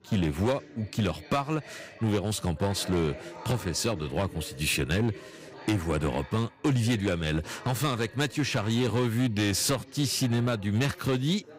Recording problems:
distortion; slight; 6% of the sound clipped
background chatter; noticeable; throughout; 4 voices, 20 dB below the speech

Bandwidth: 15.5 kHz